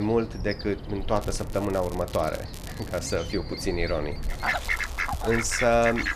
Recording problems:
animal sounds; loud; throughout; 5 dB below the speech
crackling; noticeable; from 1 to 2.5 s, at 2.5 s and from 4 to 5.5 s; 20 dB below the speech
abrupt cut into speech; at the start

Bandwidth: 14.5 kHz